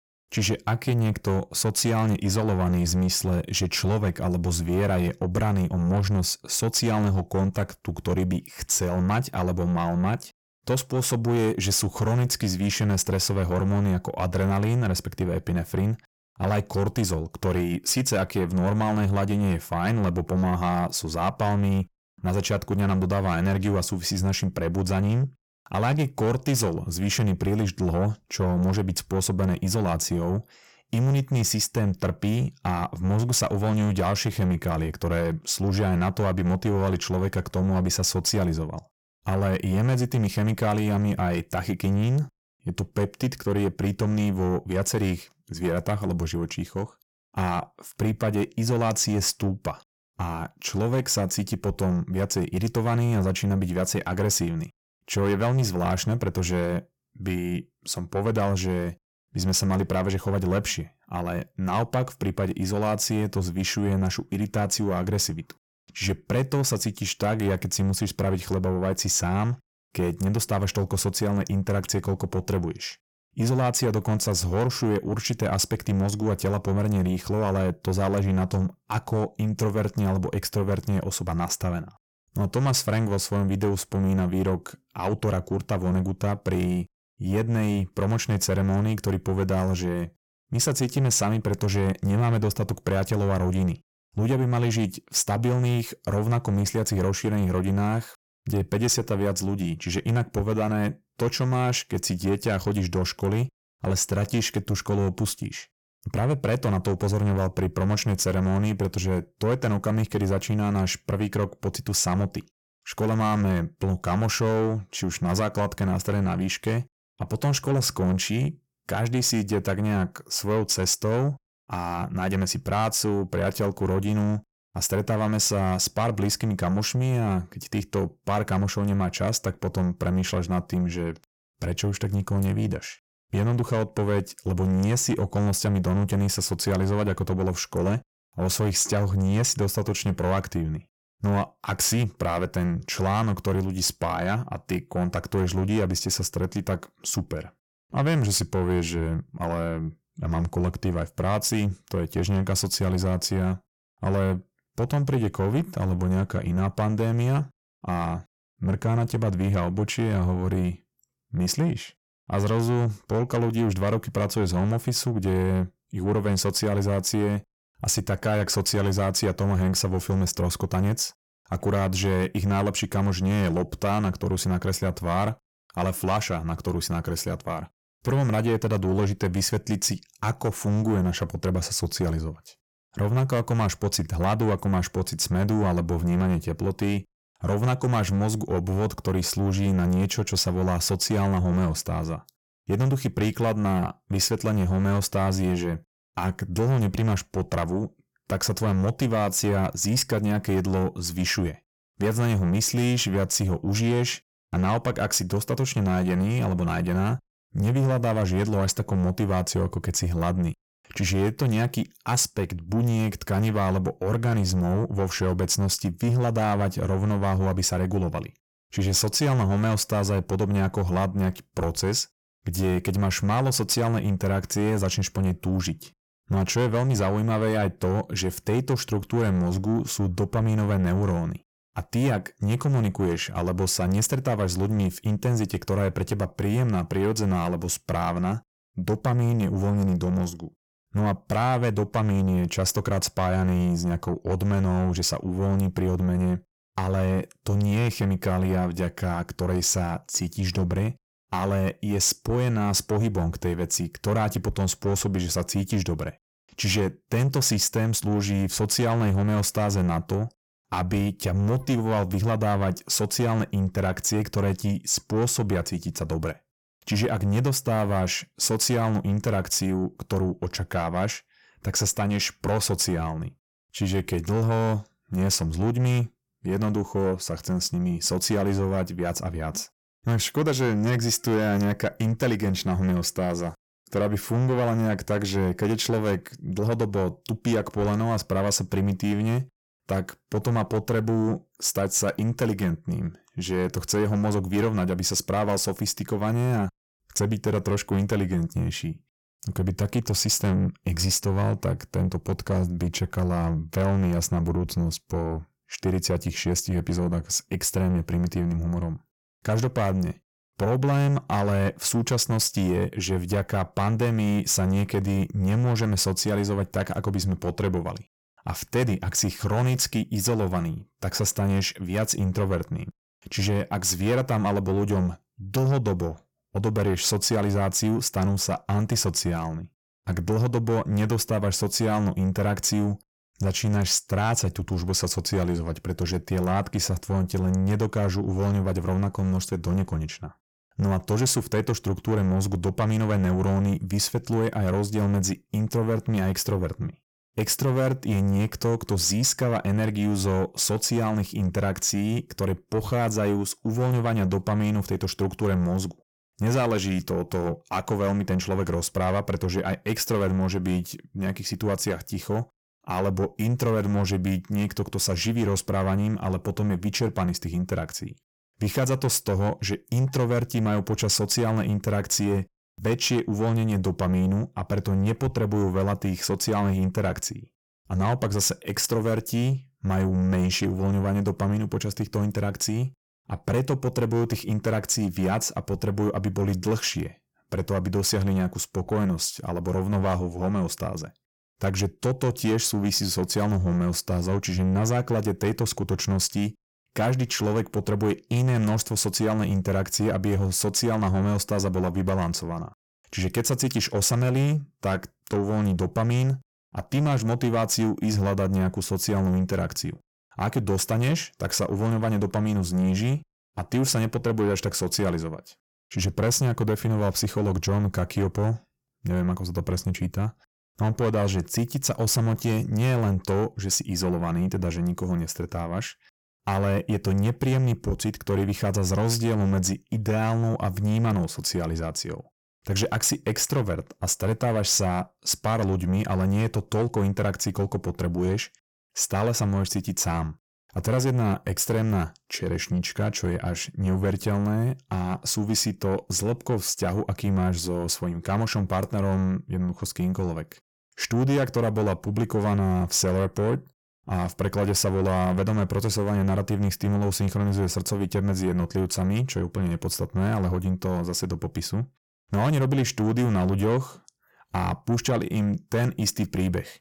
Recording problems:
distortion; slight; 10 dB below the speech

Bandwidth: 17 kHz